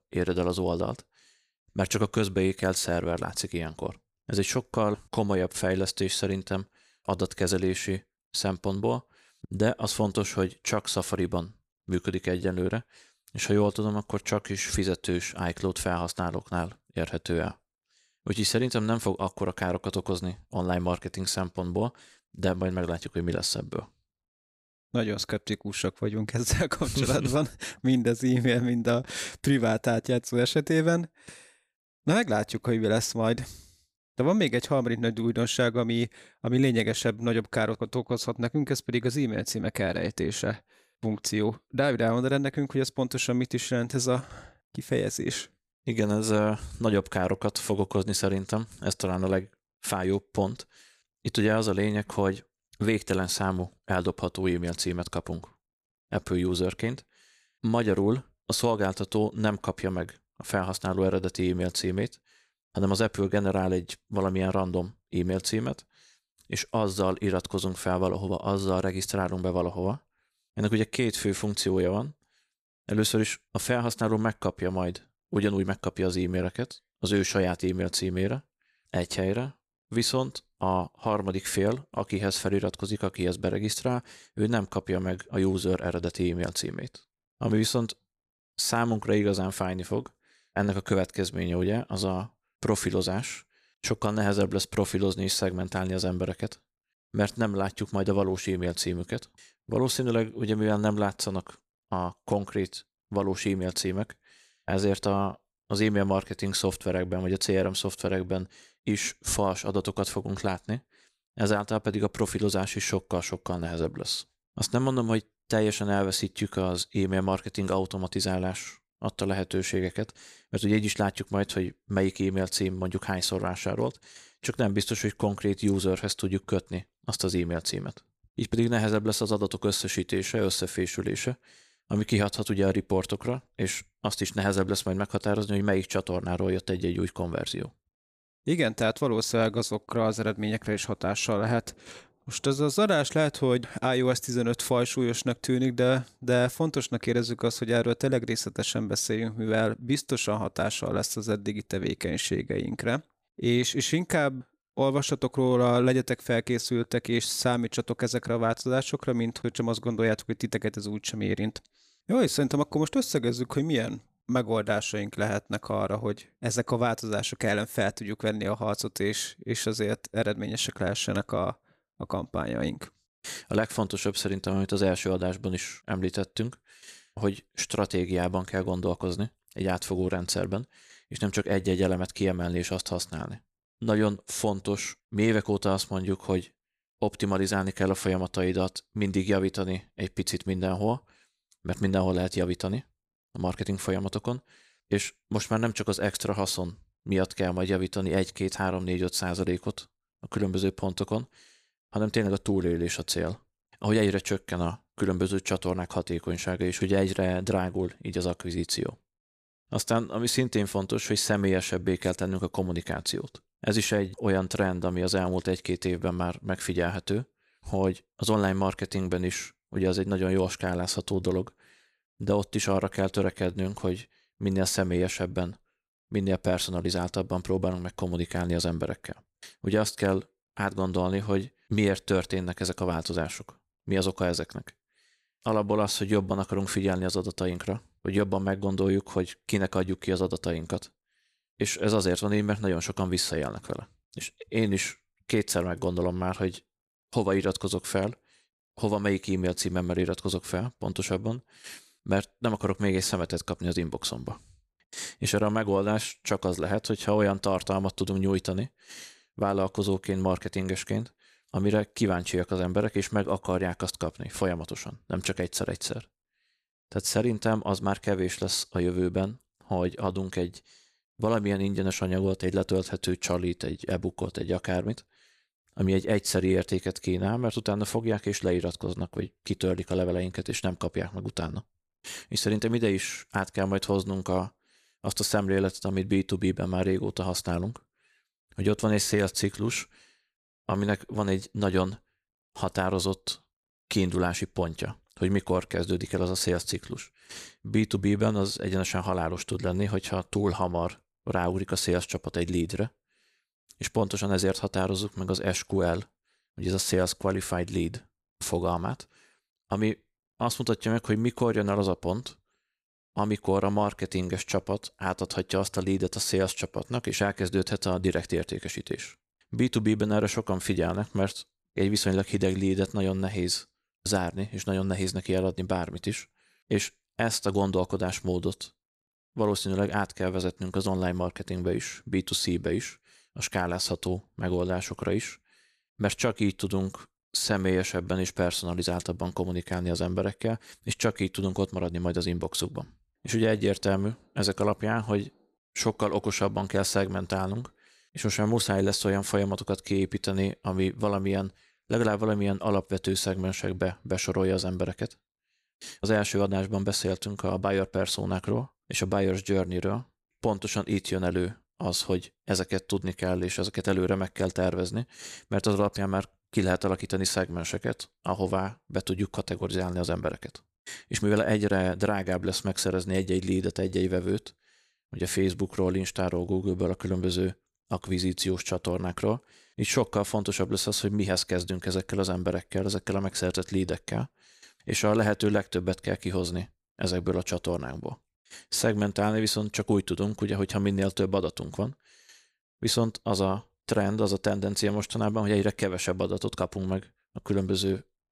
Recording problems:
none

